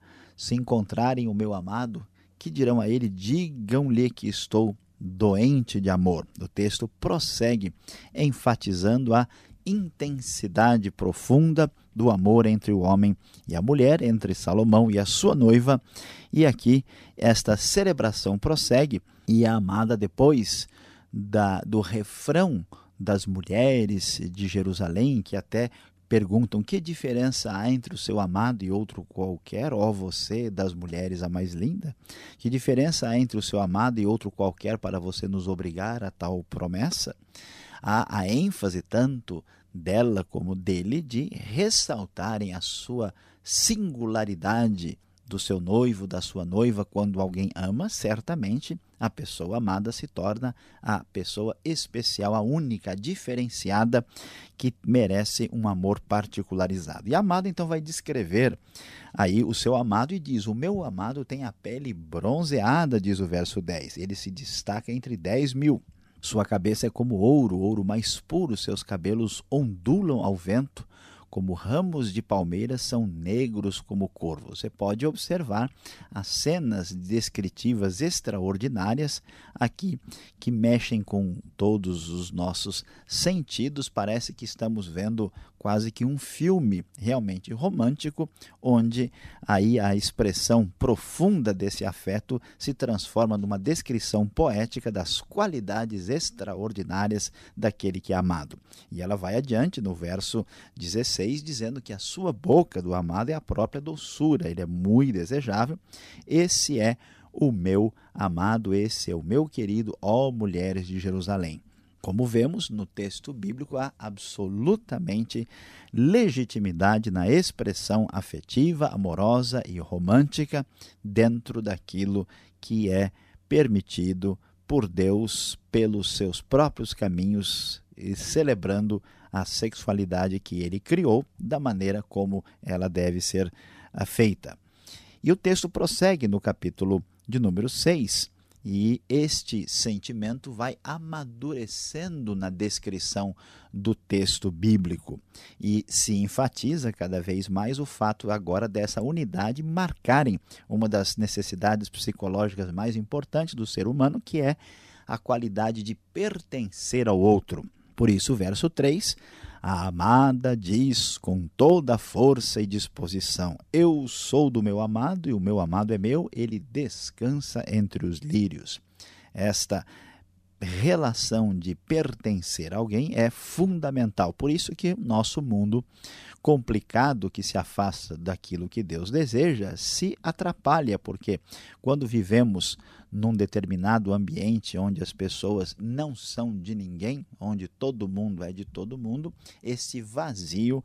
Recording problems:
none

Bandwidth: 14.5 kHz